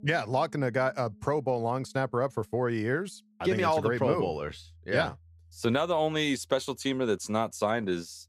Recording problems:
background music; faint; throughout; 30 dB below the speech

